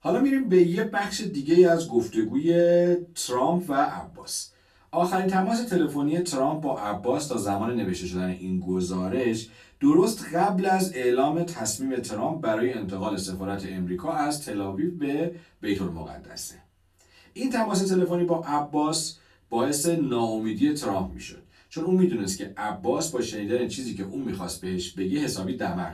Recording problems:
off-mic speech; far
room echo; very slight; dies away in 0.2 s

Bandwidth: 14 kHz